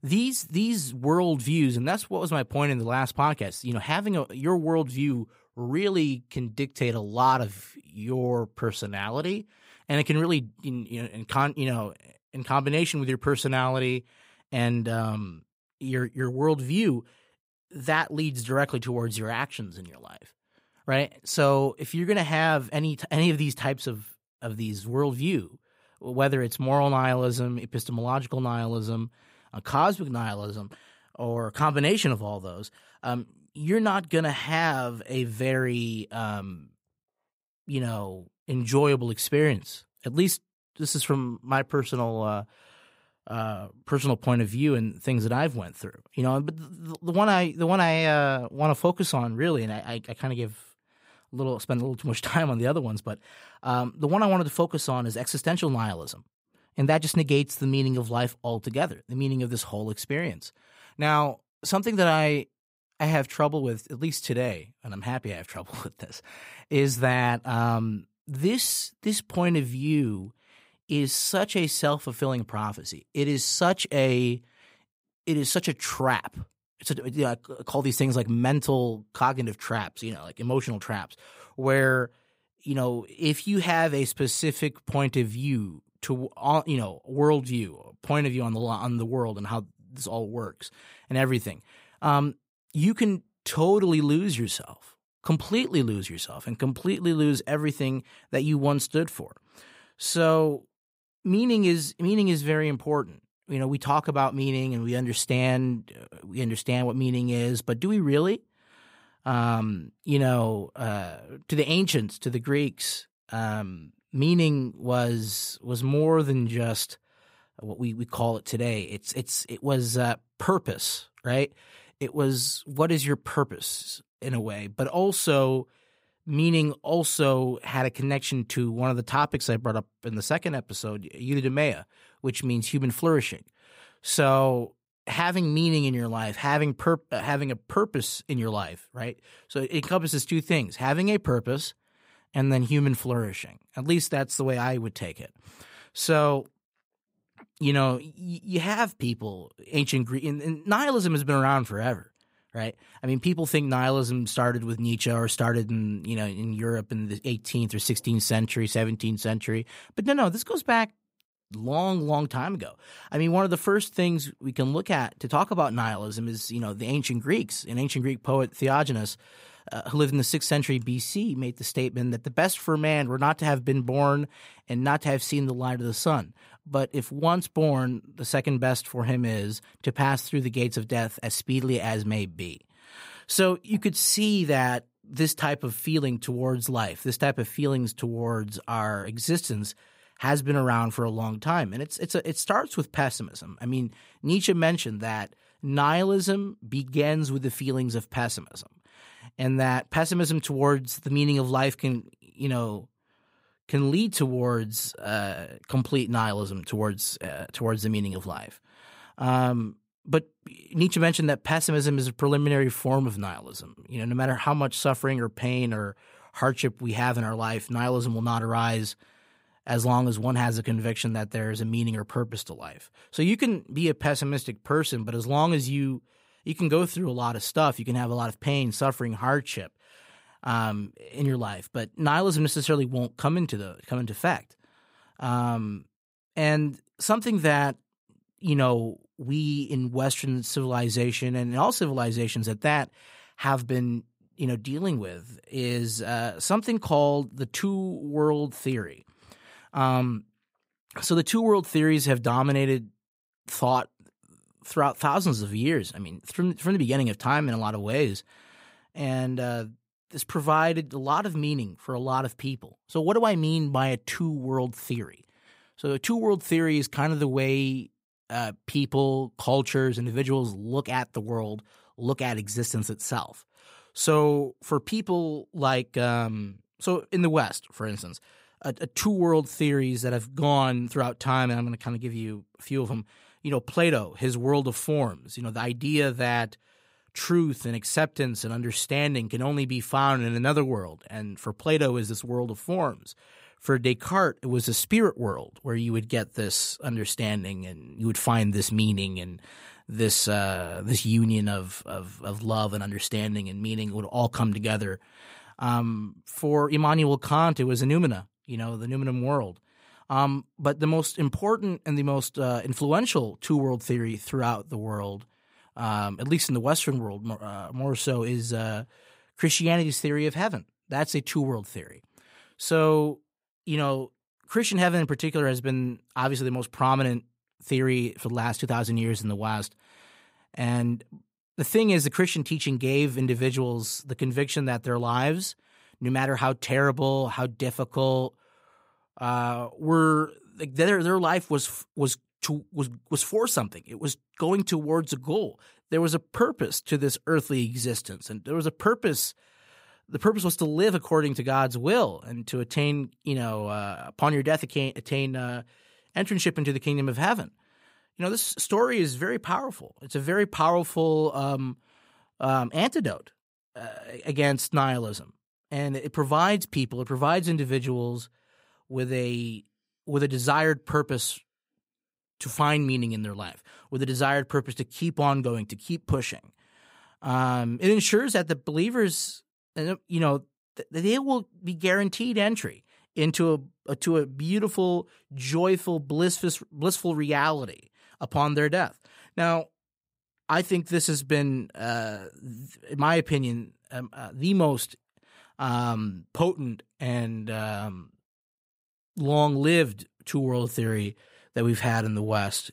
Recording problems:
none

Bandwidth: 15.5 kHz